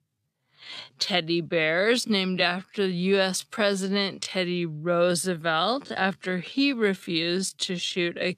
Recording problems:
wrong speed, natural pitch; too slow; 0.6 times normal speed

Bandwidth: 14.5 kHz